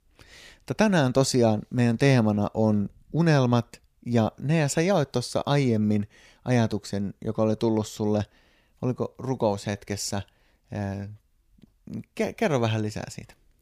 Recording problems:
none

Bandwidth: 15 kHz